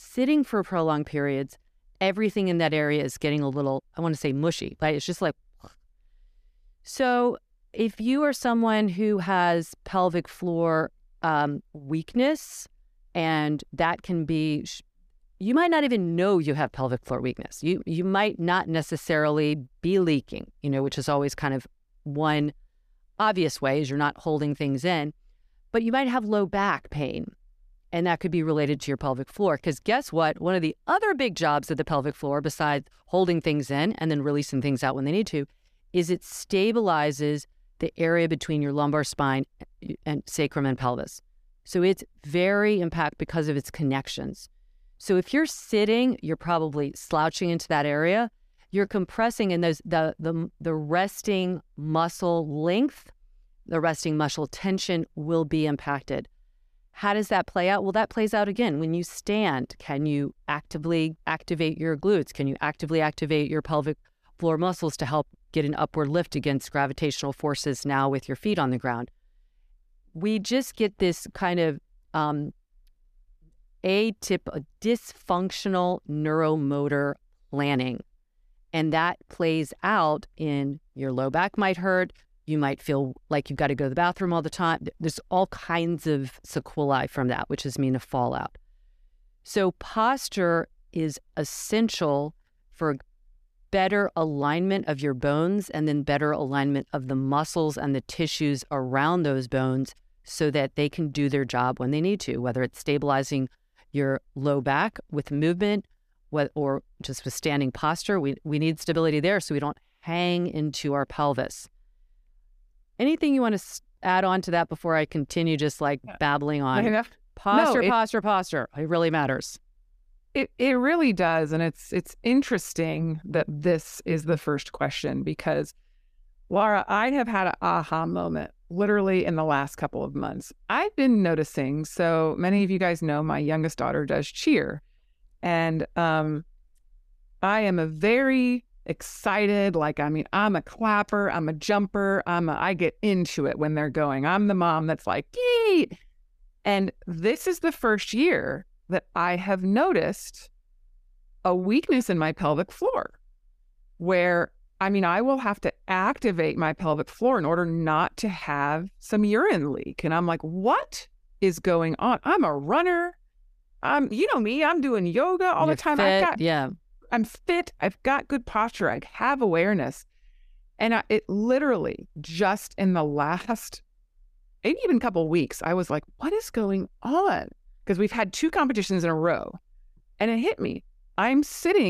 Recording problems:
abrupt cut into speech; at the end

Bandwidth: 14.5 kHz